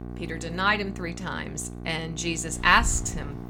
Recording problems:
traffic noise; loud; at 2.5 s; 9 dB below the speech
electrical hum; faint; throughout; 60 Hz, 20 dB below the speech

